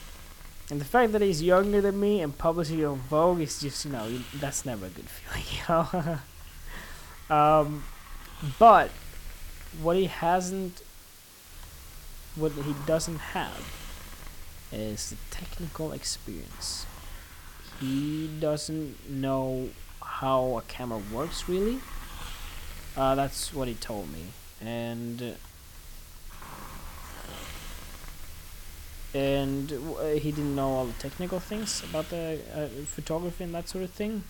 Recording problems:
hiss; noticeable; throughout; 15 dB below the speech

